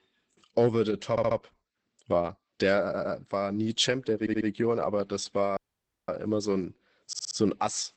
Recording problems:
garbled, watery; badly; nothing above 8 kHz
audio stuttering; 4 times, first at 1 s
audio cutting out; at 5.5 s for 0.5 s

